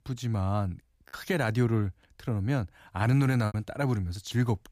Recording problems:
choppy; occasionally; at 1 s and at 3.5 s; 5% of the speech affected

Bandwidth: 15 kHz